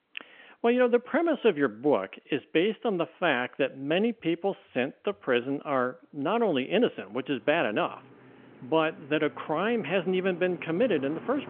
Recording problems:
phone-call audio; nothing above 3.5 kHz
traffic noise; faint; throughout; 20 dB below the speech

